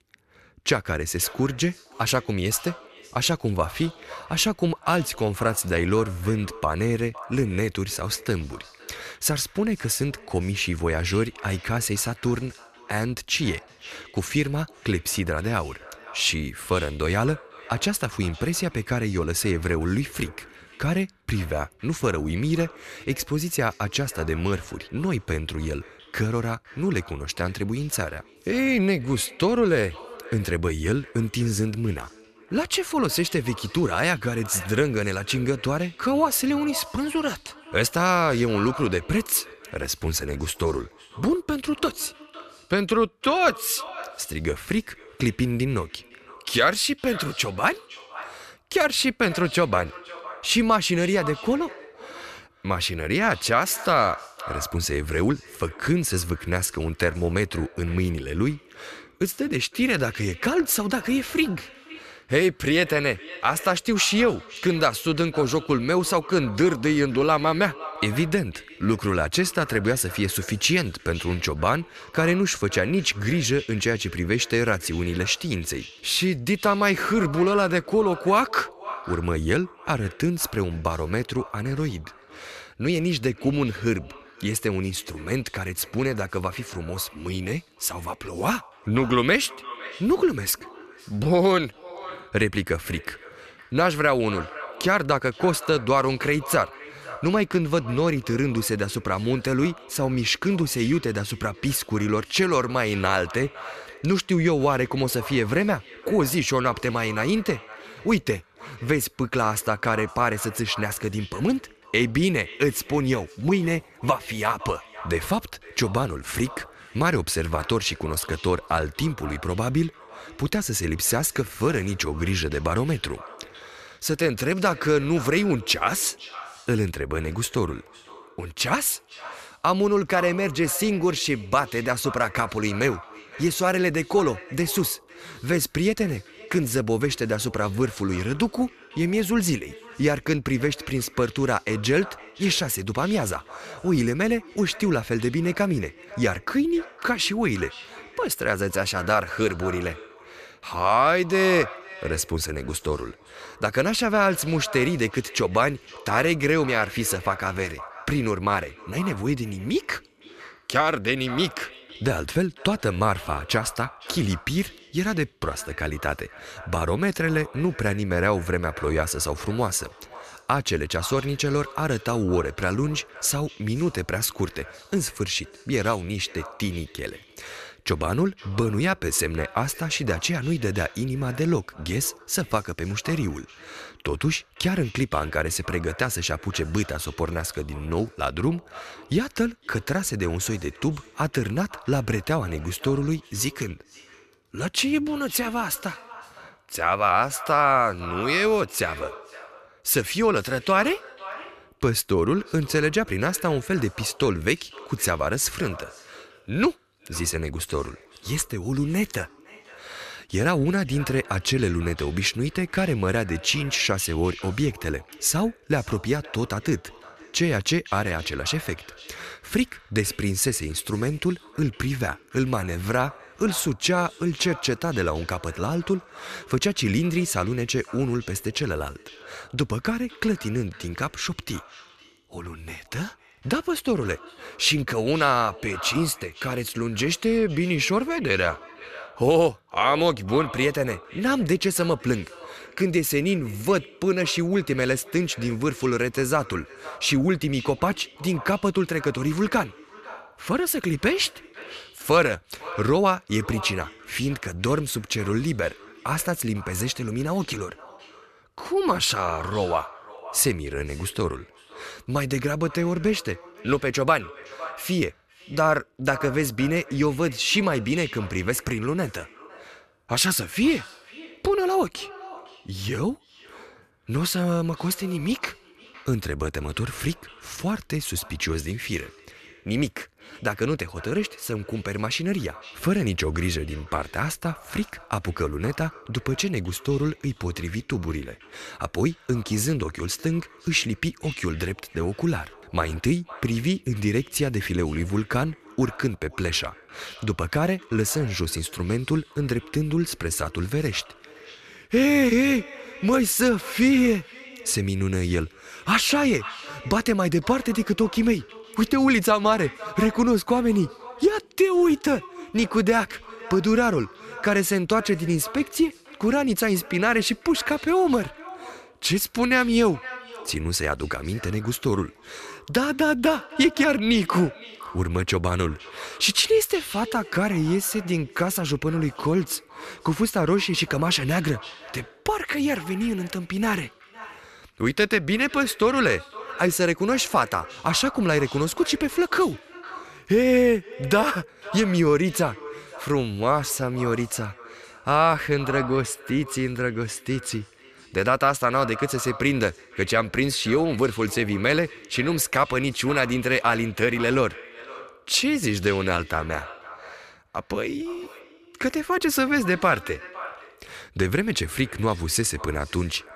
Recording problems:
echo of what is said; noticeable; throughout; 510 ms later, 20 dB below the speech

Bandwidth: 14 kHz